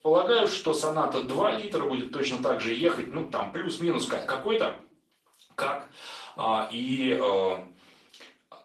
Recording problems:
off-mic speech; far
thin; somewhat; fading below 500 Hz
room echo; slight; dies away in 0.4 s
garbled, watery; slightly; nothing above 13.5 kHz

